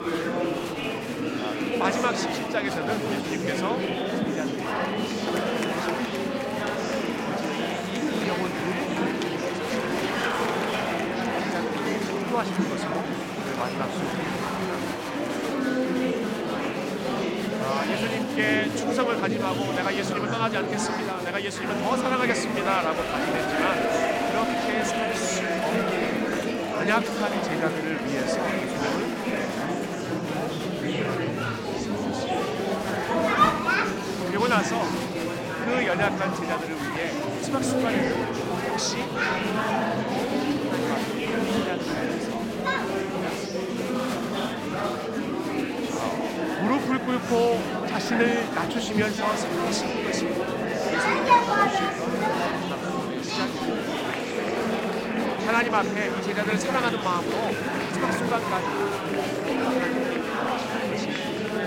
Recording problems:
murmuring crowd; very loud; throughout; 4 dB above the speech

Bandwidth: 16.5 kHz